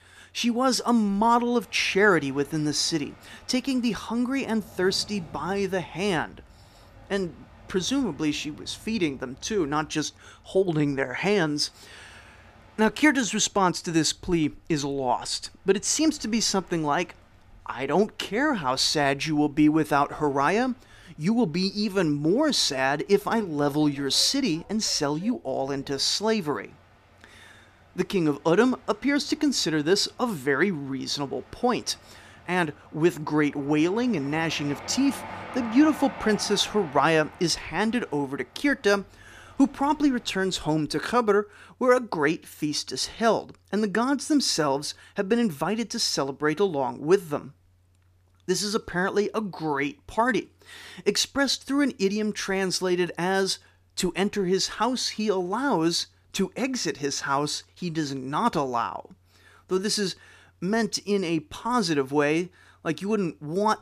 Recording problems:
train or aircraft noise; faint; until 41 s; 20 dB below the speech

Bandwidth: 14.5 kHz